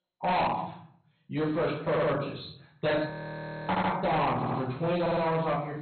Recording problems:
distortion; heavy; 16% of the sound clipped
off-mic speech; far
garbled, watery; badly; nothing above 4 kHz
room echo; noticeable; dies away in 0.5 s
audio stuttering; 4 times, first at 2 s
audio freezing; at 3 s for 0.5 s

